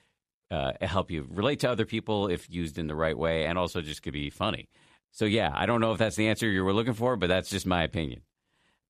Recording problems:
none

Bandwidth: 13.5 kHz